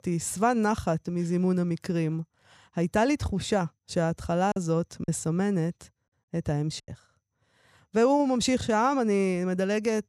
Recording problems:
choppy; very; from 4.5 to 7 s; 6% of the speech affected

